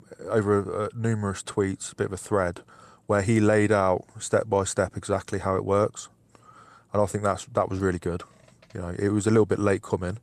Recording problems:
none

